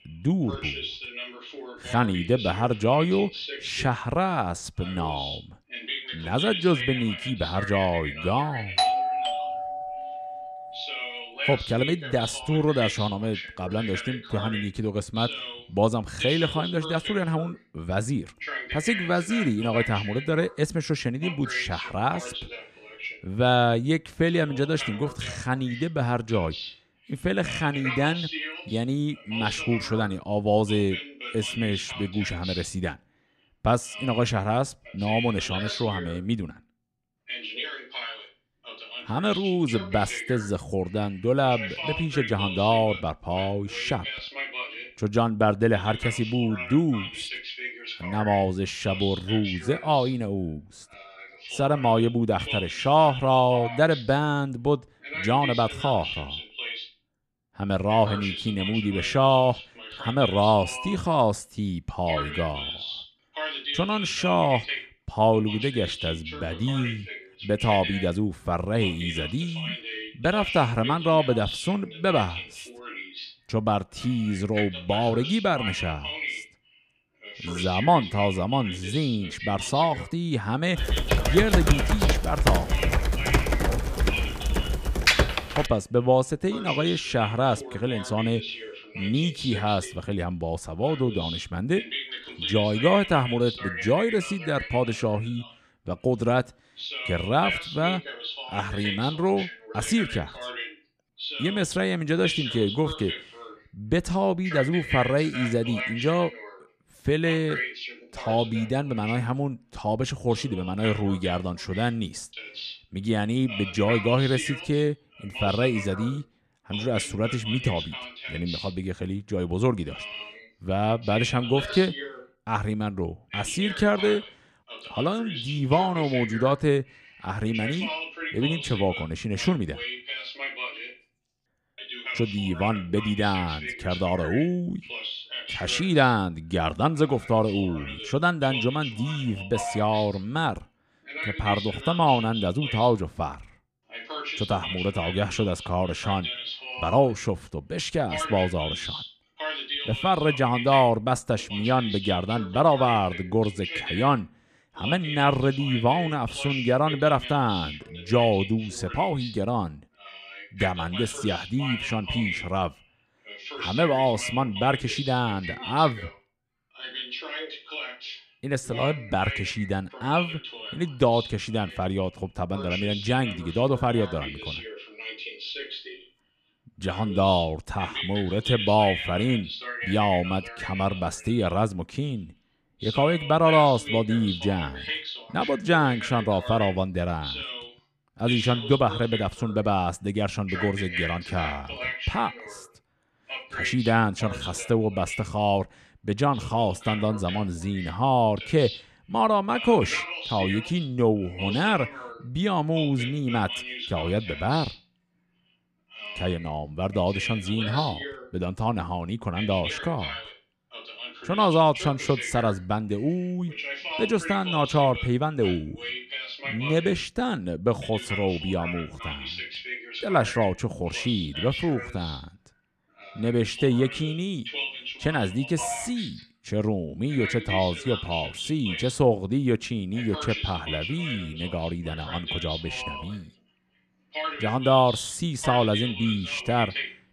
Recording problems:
voice in the background; loud; throughout; 8 dB below the speech
doorbell; loud; from 9 to 11 s; peak 3 dB above the speech
keyboard typing; loud; from 1:21 to 1:26; peak 6 dB above the speech

